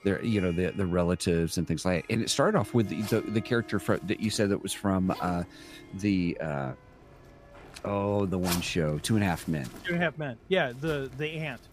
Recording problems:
household noises; noticeable; throughout; 15 dB below the speech
background music; faint; throughout; 20 dB below the speech

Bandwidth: 15 kHz